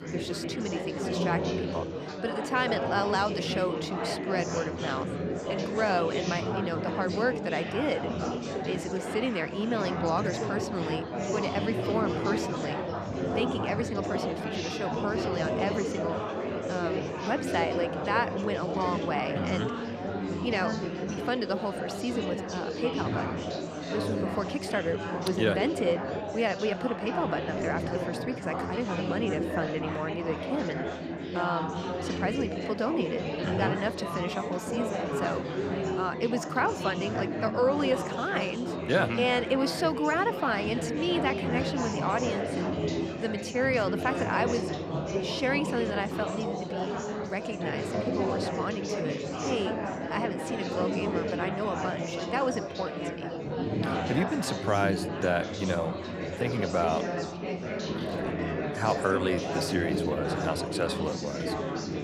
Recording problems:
chatter from many people; loud; throughout; 1 dB below the speech

